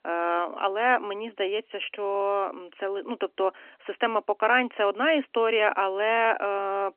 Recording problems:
phone-call audio; nothing above 3 kHz

